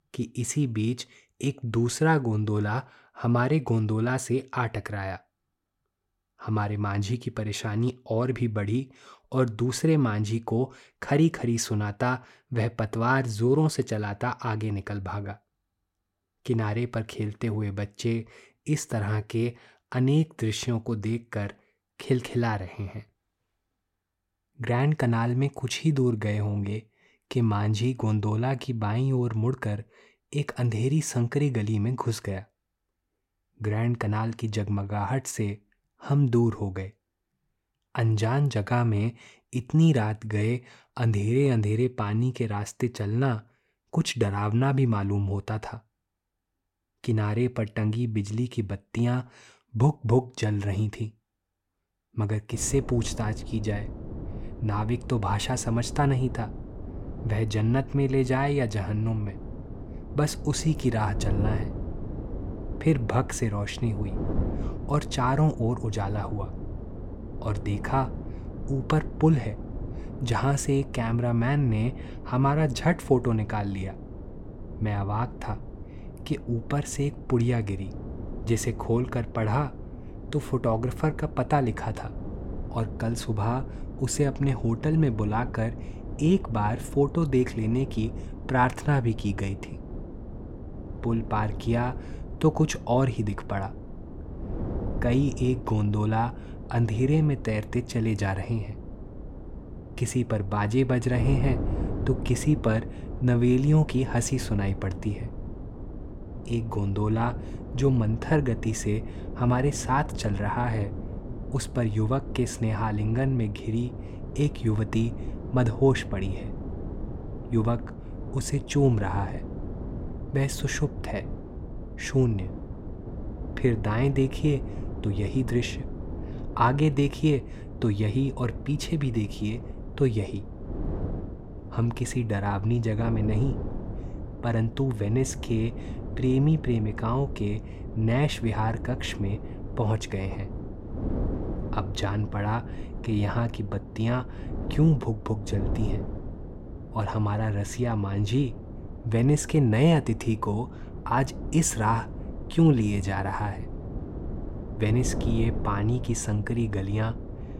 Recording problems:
wind noise on the microphone; occasional gusts; from 53 s on; 15 dB below the speech

